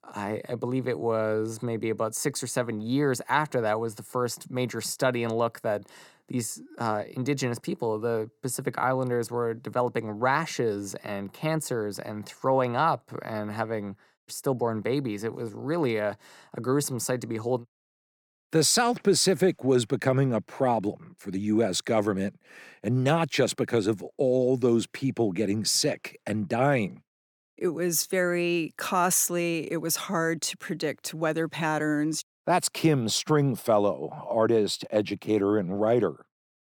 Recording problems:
none

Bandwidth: 18.5 kHz